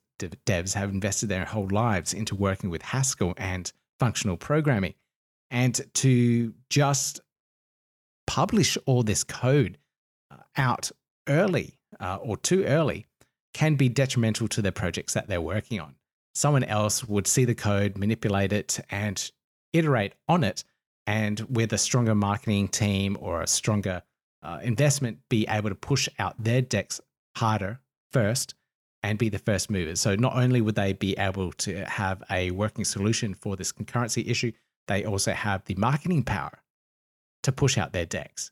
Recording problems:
none

